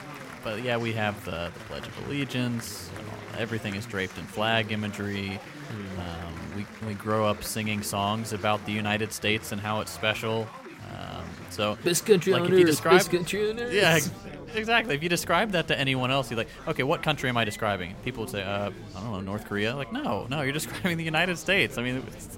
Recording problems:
chatter from many people; noticeable; throughout; 15 dB below the speech

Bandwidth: 16 kHz